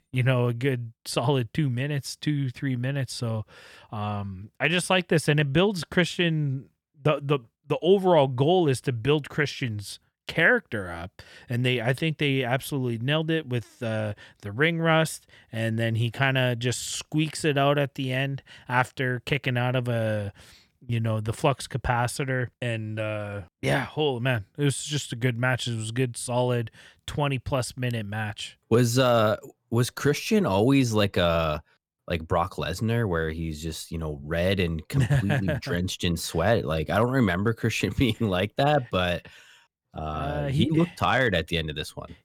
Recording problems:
none

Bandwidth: 19 kHz